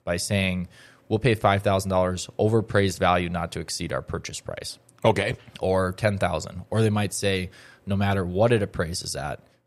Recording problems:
none

